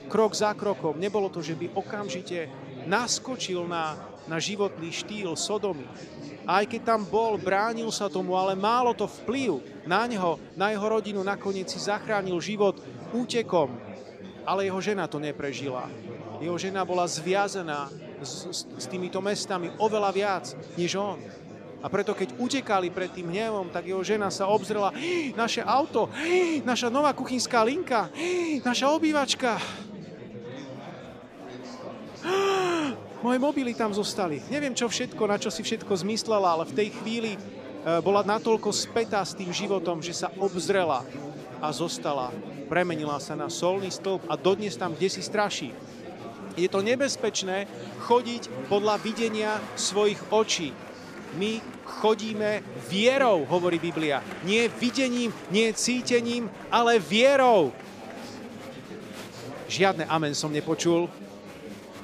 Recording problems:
murmuring crowd; noticeable; throughout; 15 dB below the speech

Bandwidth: 15 kHz